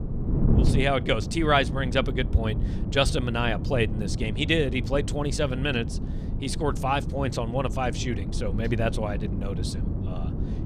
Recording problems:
wind noise on the microphone; occasional gusts; 10 dB below the speech

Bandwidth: 14.5 kHz